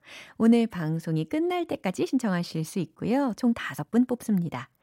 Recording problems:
uneven, jittery; strongly; from 0.5 to 4 s

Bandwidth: 16 kHz